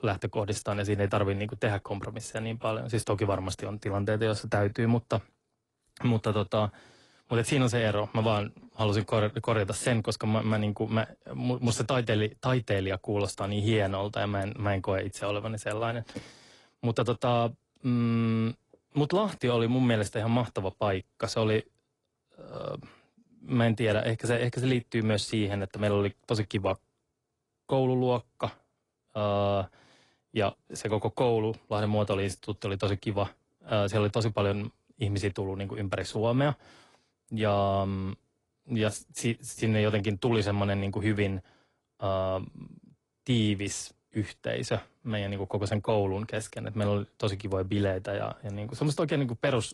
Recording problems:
garbled, watery; slightly; nothing above 10.5 kHz

